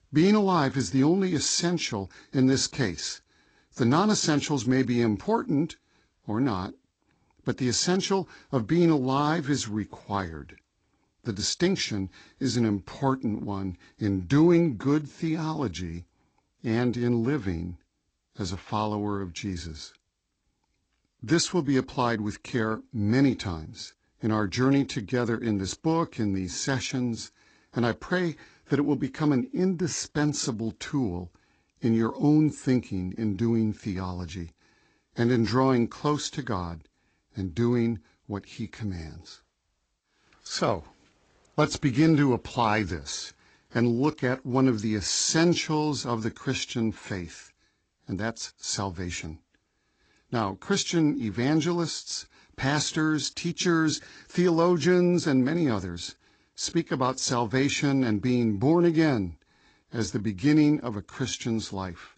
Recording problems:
garbled, watery; slightly; nothing above 8 kHz

